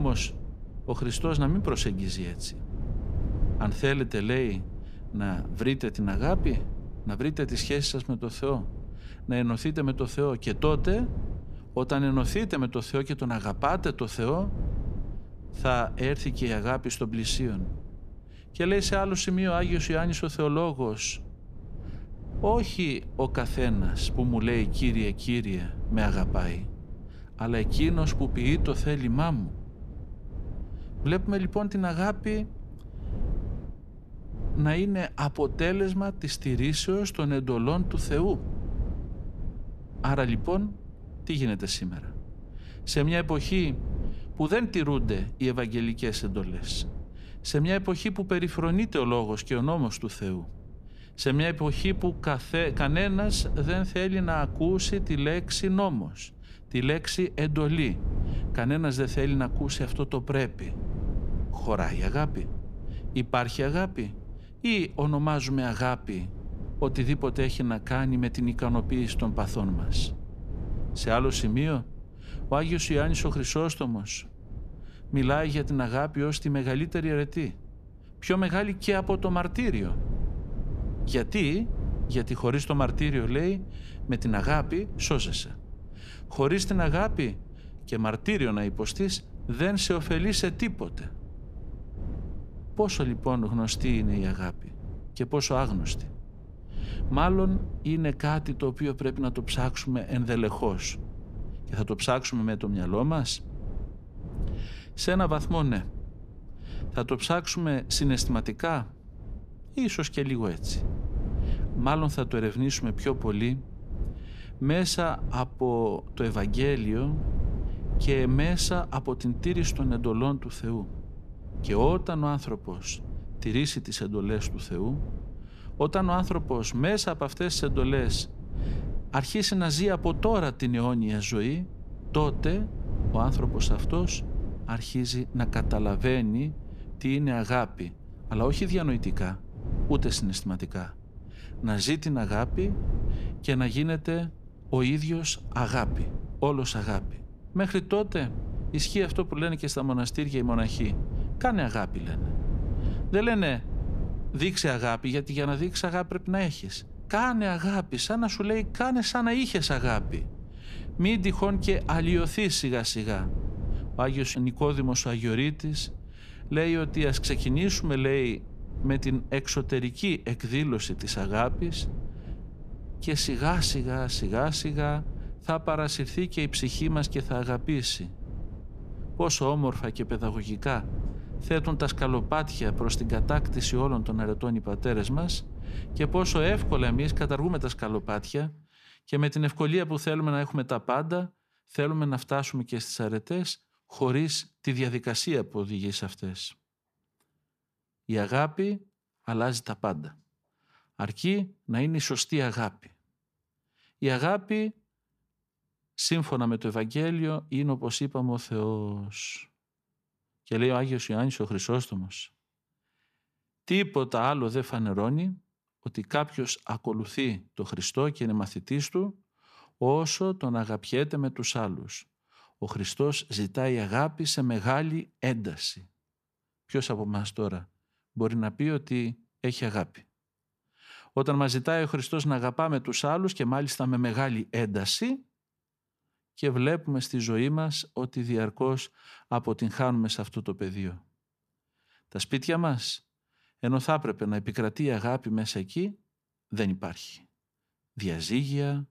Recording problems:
wind noise on the microphone; occasional gusts; until 3:08; 20 dB below the speech
abrupt cut into speech; at the start

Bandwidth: 14.5 kHz